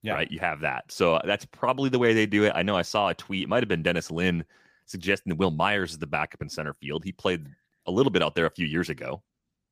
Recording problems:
none

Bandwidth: 15 kHz